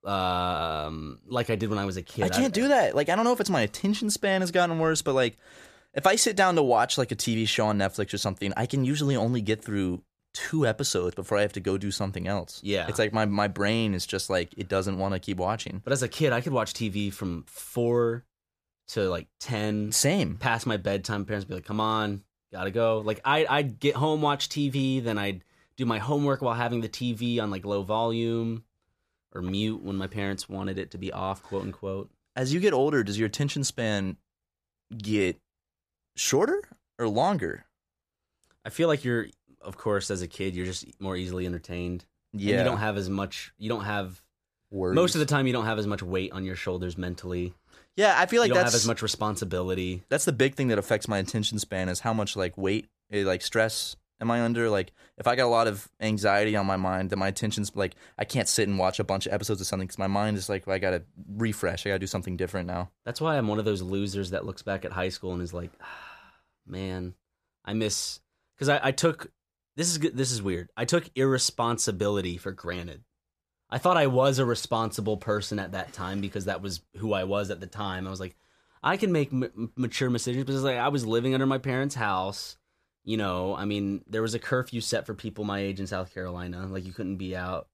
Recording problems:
none

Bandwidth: 14.5 kHz